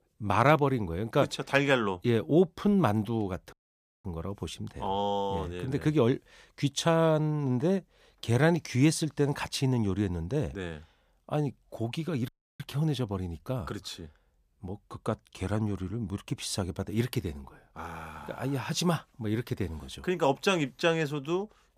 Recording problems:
audio cutting out; at 3.5 s for 0.5 s and at 12 s

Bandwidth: 15 kHz